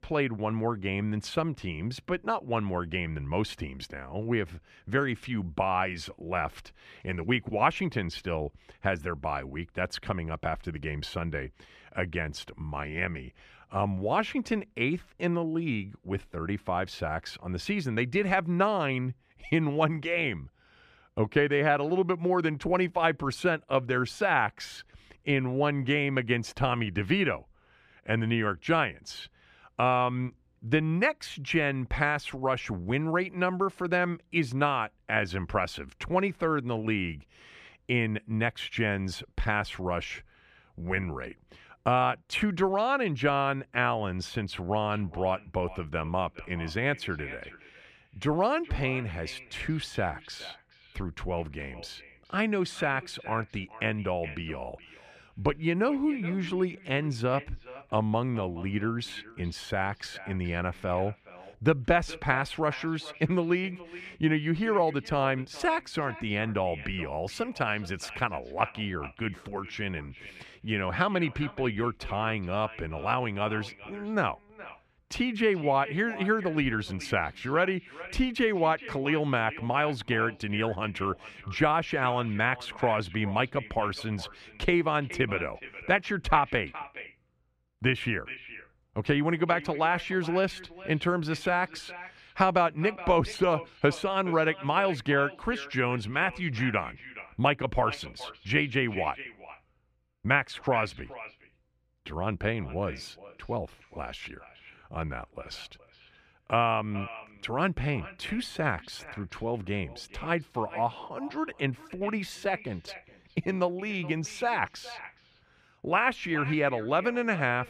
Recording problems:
echo of what is said; noticeable; from 45 s on; 420 ms later, 15 dB below the speech

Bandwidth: 14.5 kHz